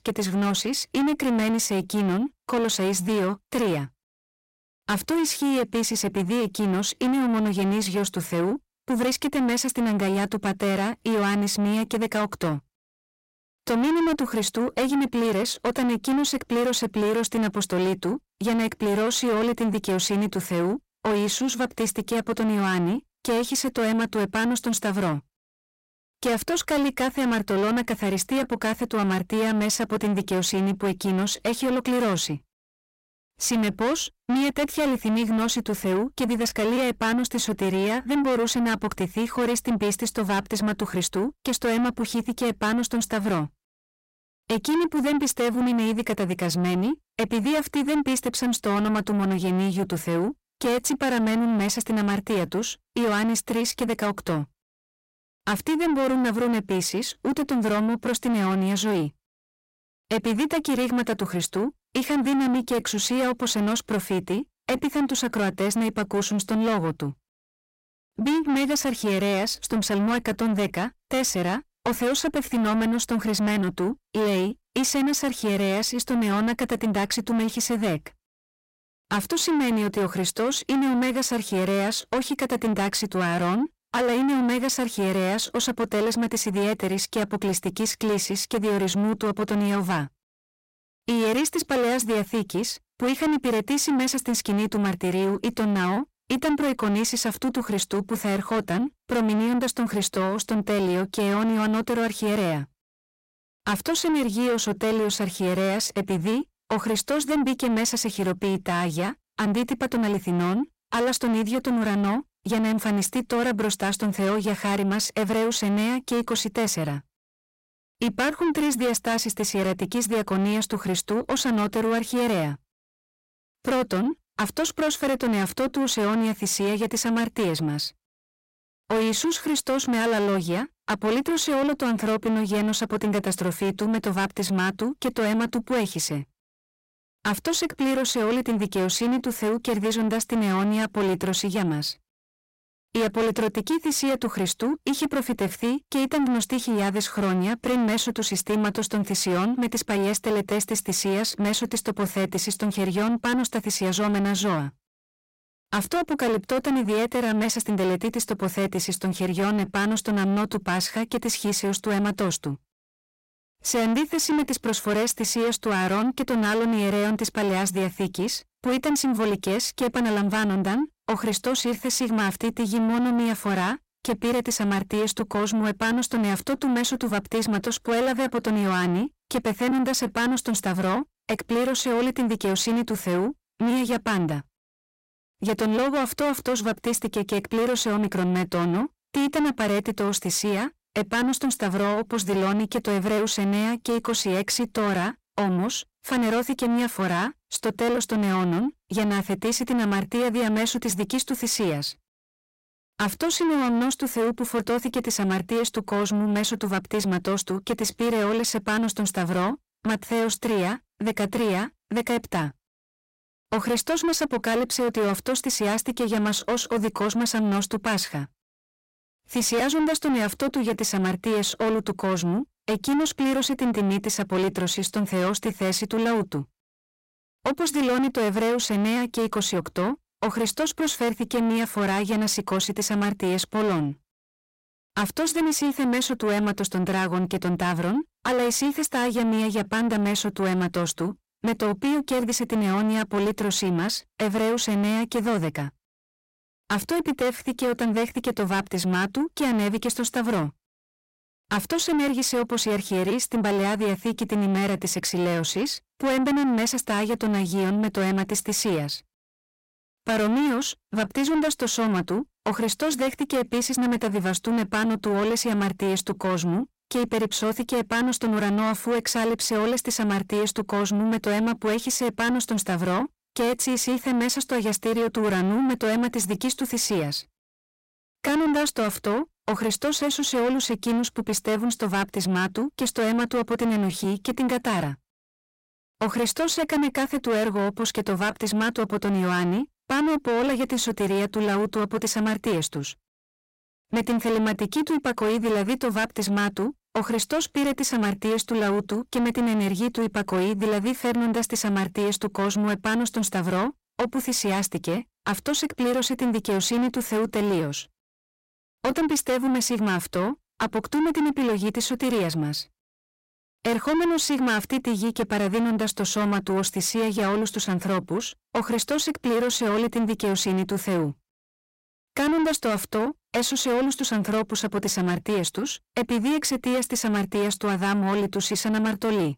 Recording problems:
distortion; heavy; 8 dB below the speech

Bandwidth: 16 kHz